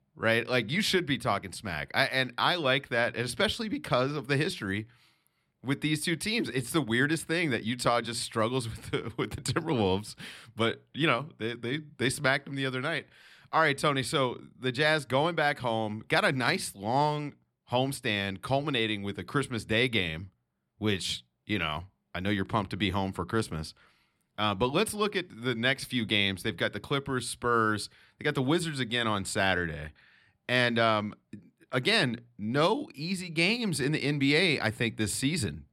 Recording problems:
none

